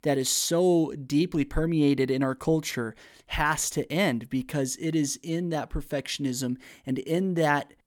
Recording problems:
none

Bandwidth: 18.5 kHz